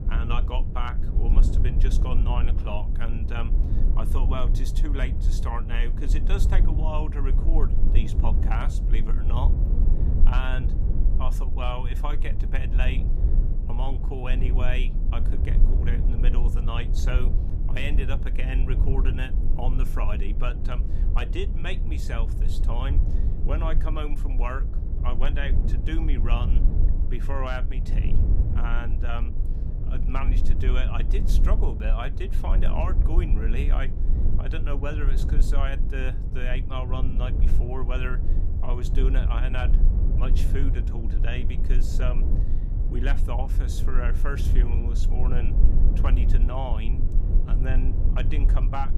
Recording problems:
low rumble; loud; throughout; 7 dB below the speech

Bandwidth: 15 kHz